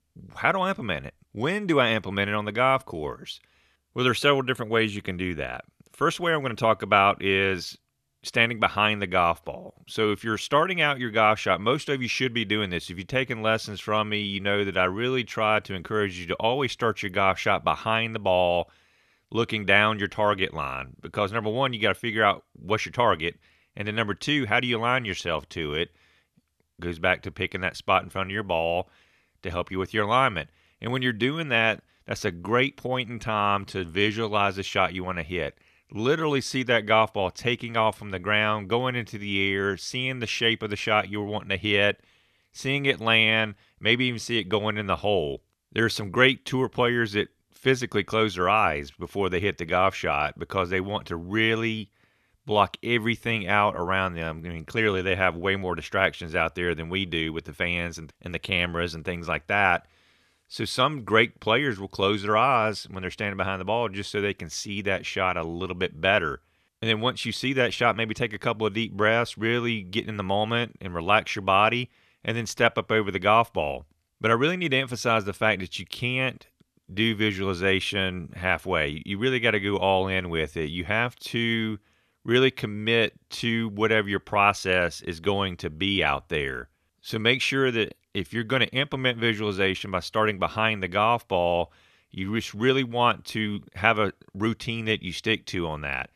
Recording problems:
none

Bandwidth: 13.5 kHz